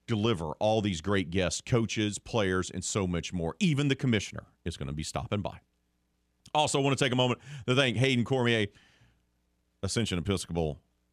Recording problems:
none

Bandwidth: 14.5 kHz